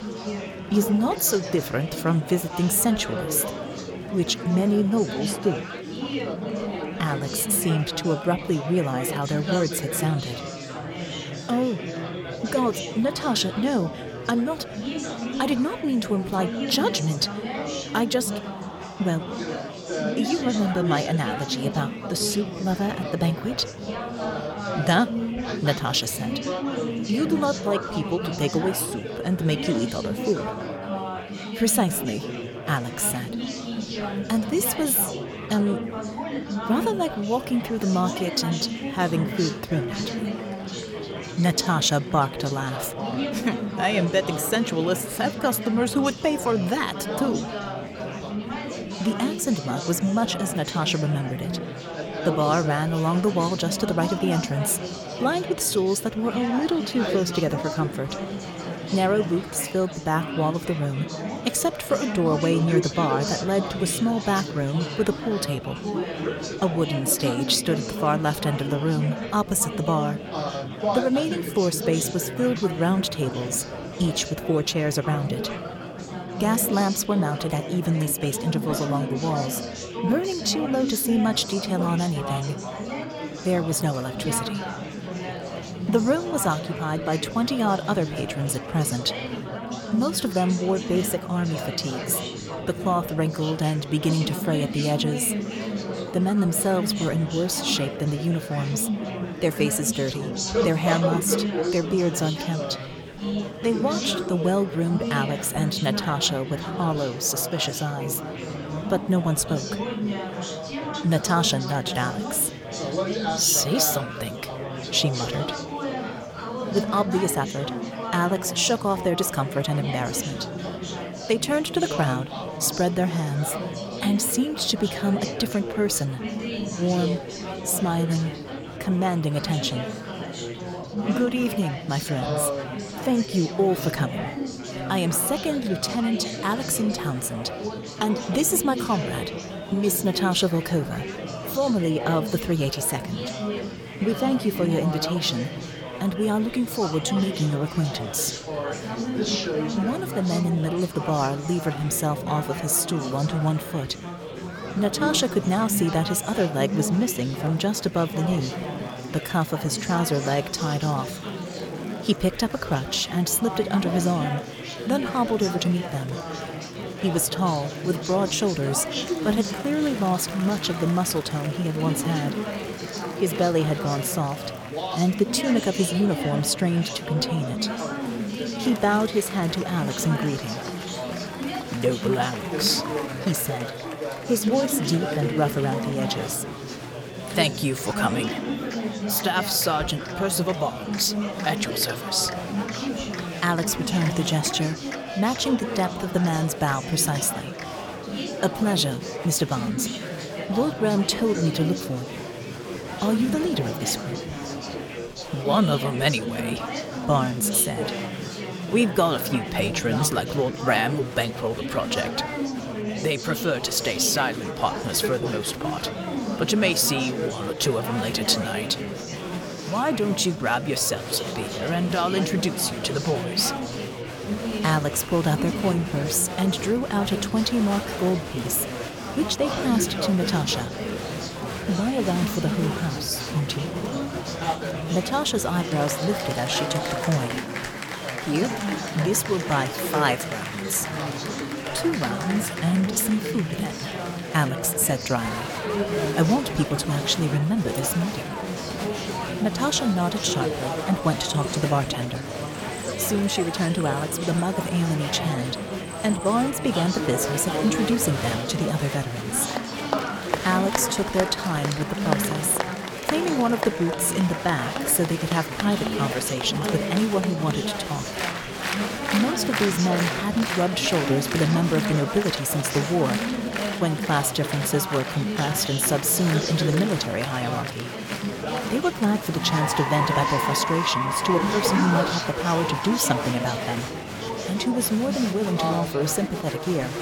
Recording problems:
murmuring crowd; loud; throughout; 5 dB below the speech

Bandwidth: 17.5 kHz